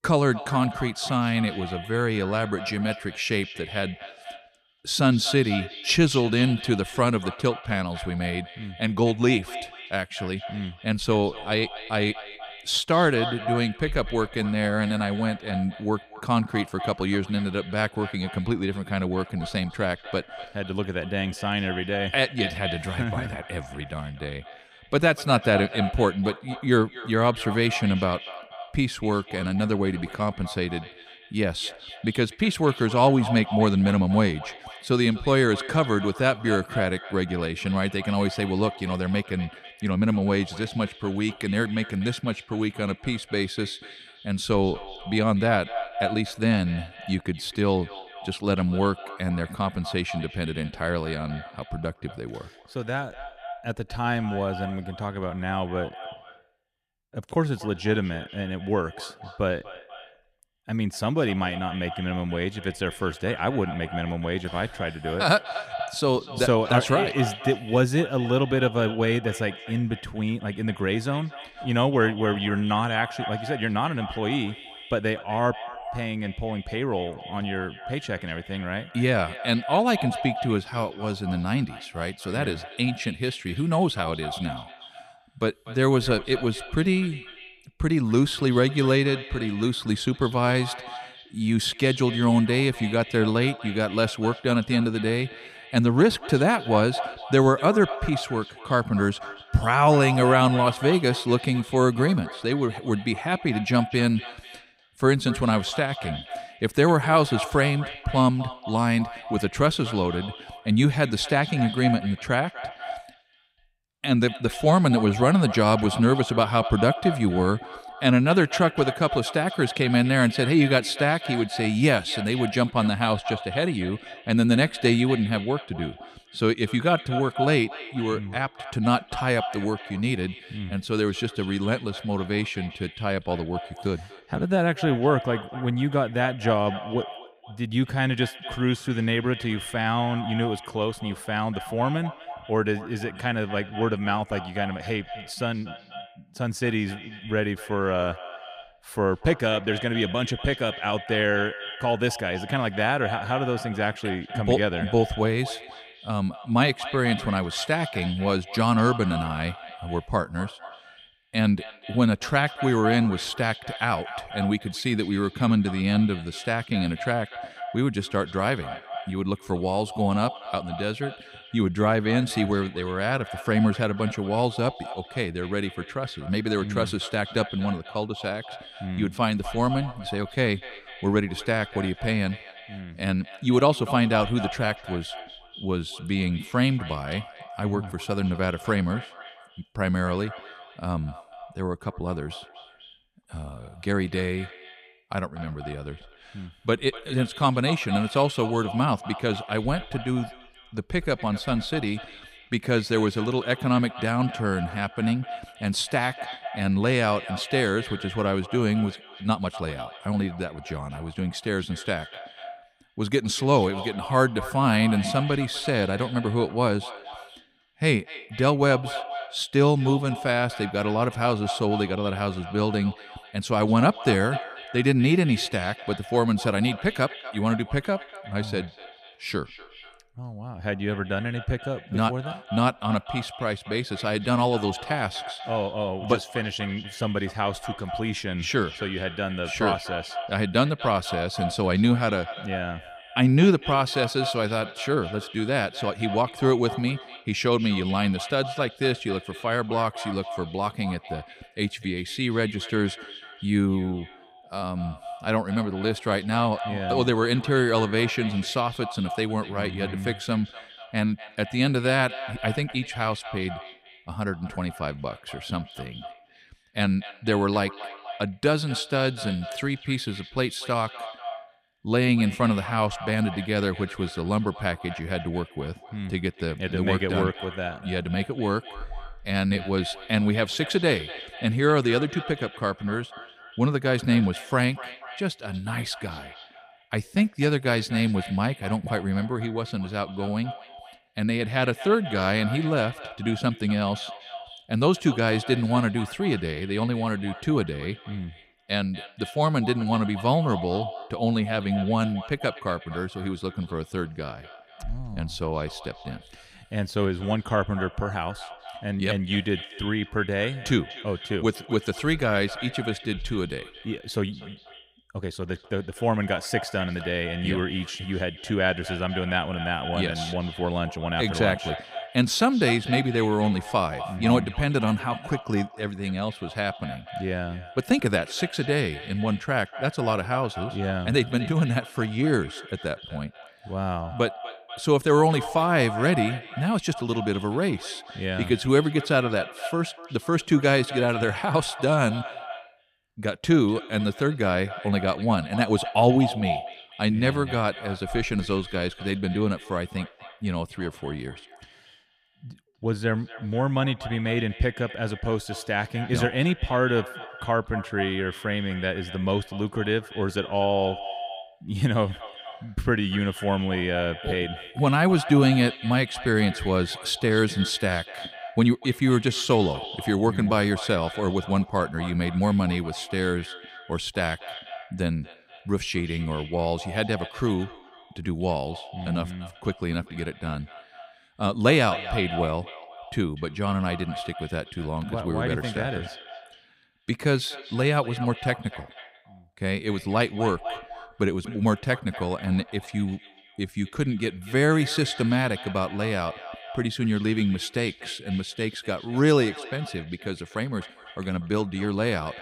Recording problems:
echo of what is said; noticeable; throughout; 240 ms later, 15 dB below the speech

